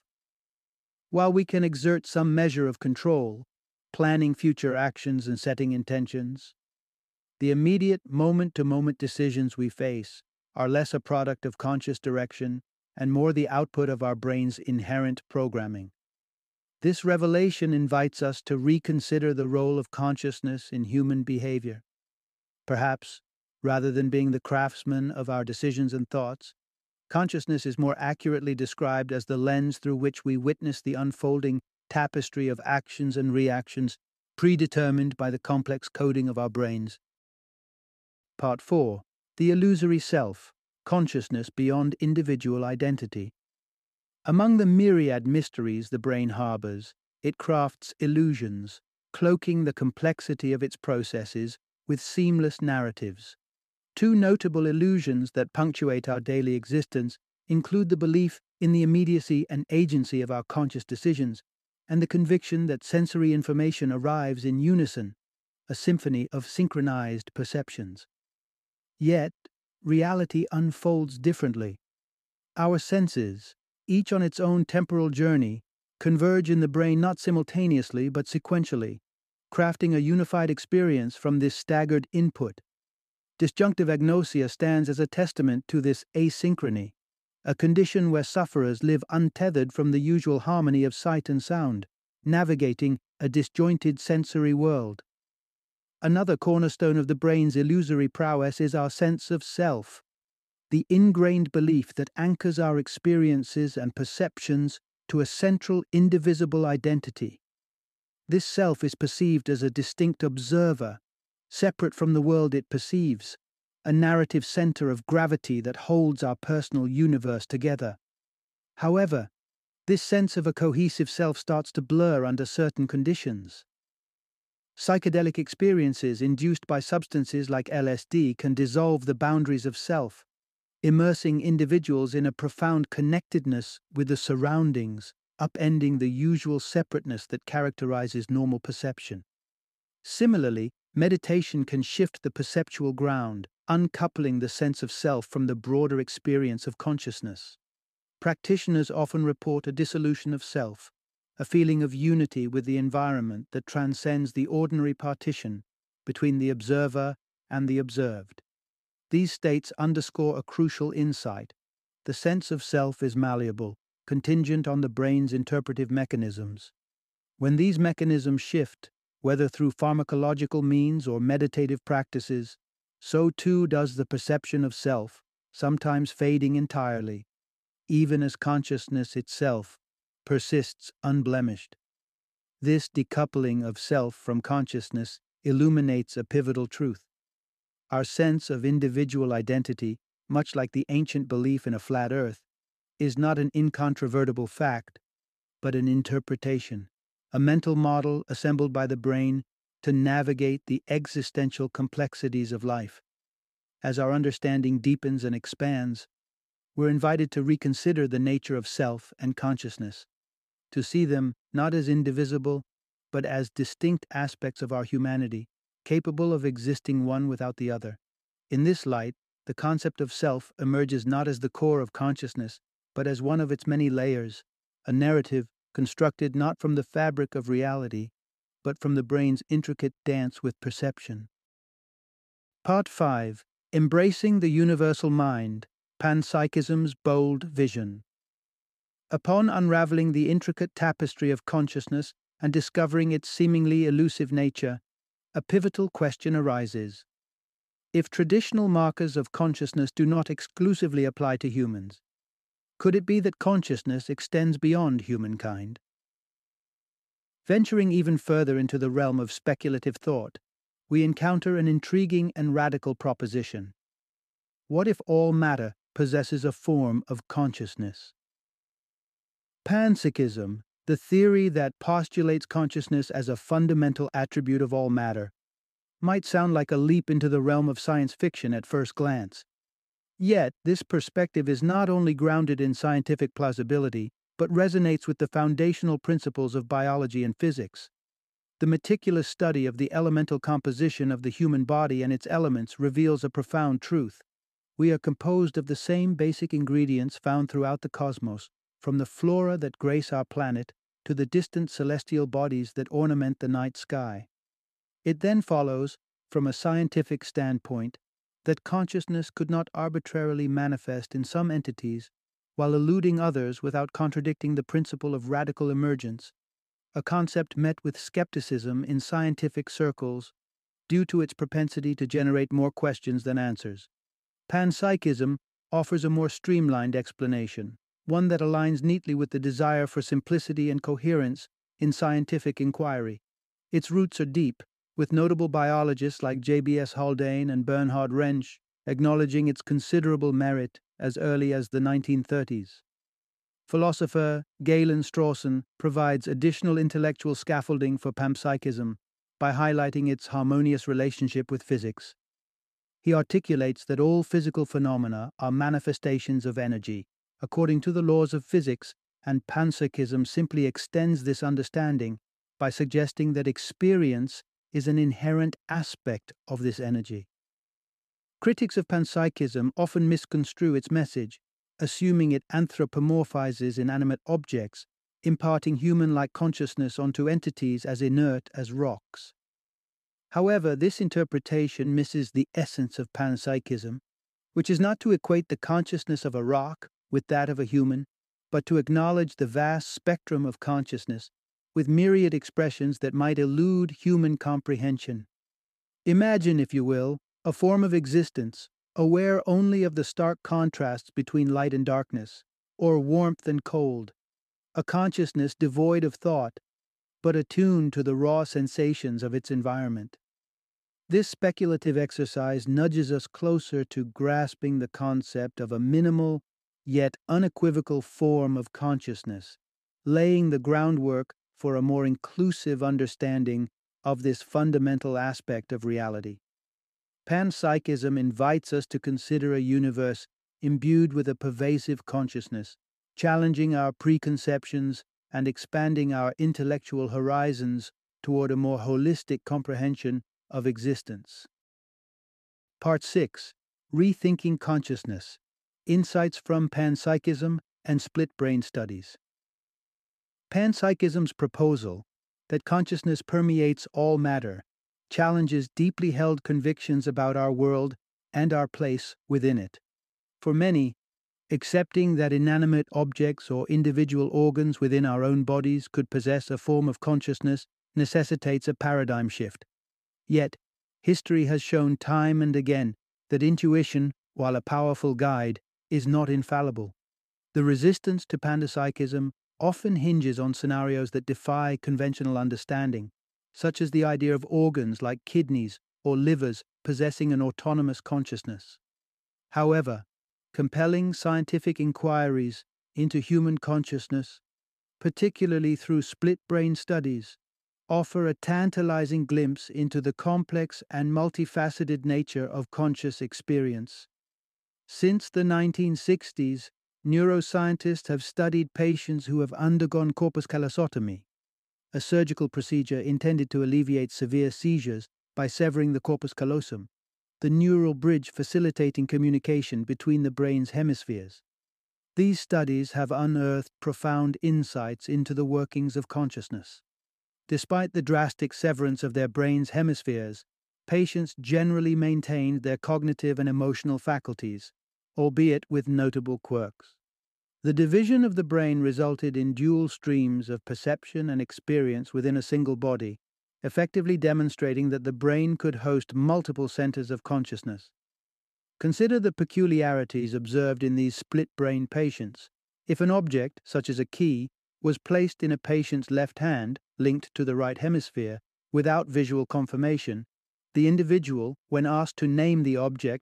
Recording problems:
none

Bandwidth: 14.5 kHz